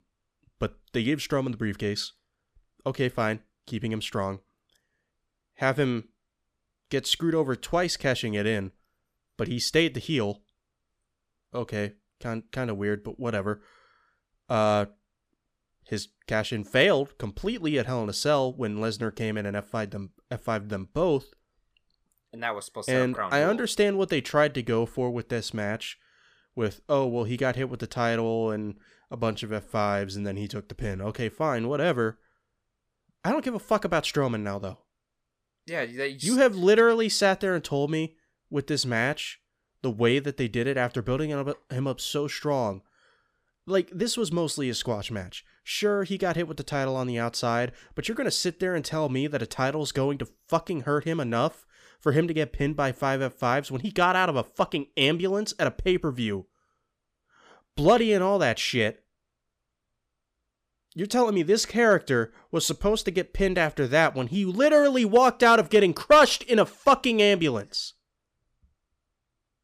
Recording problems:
none

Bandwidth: 15 kHz